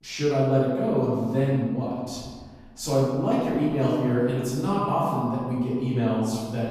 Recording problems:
room echo; strong; dies away in 1.5 s
off-mic speech; far

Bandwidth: 14.5 kHz